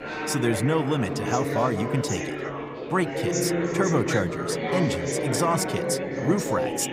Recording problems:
chatter from many people; loud; throughout; 1 dB below the speech

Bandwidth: 15.5 kHz